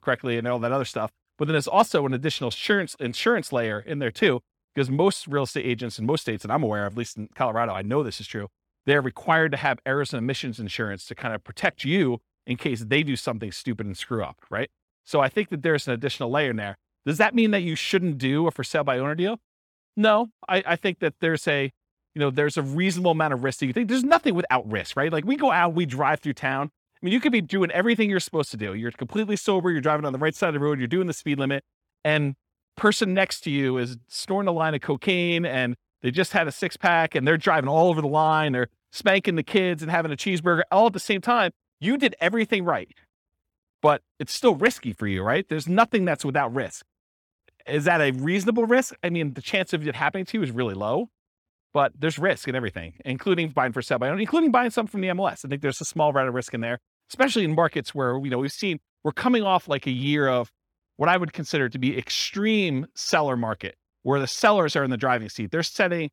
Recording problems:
none

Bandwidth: 18 kHz